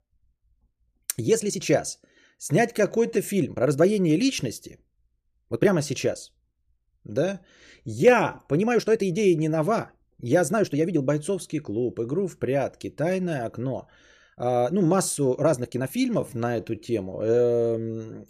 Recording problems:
uneven, jittery; strongly; from 1 to 18 s

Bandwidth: 14.5 kHz